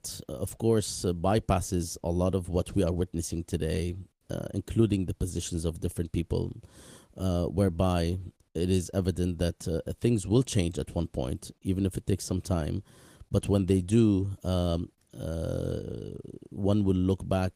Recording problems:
garbled, watery; slightly; nothing above 15 kHz

